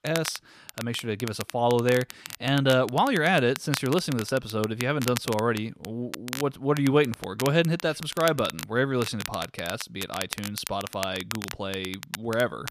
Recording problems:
crackle, like an old record; noticeable; 10 dB below the speech

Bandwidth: 14.5 kHz